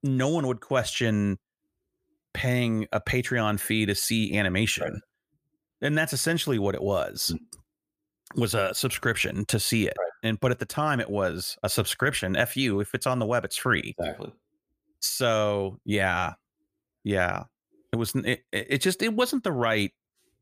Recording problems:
none

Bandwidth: 15 kHz